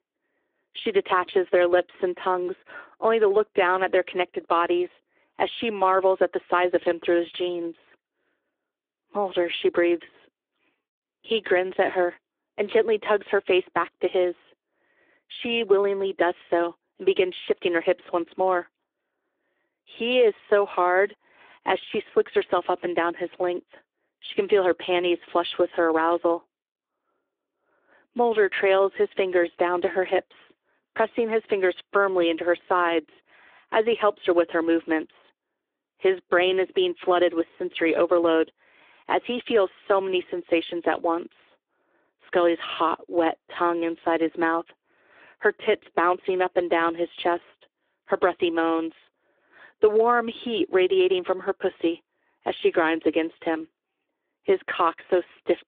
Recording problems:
phone-call audio

